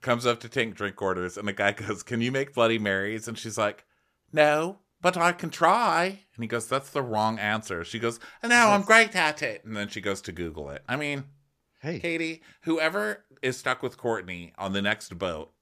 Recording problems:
none

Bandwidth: 14.5 kHz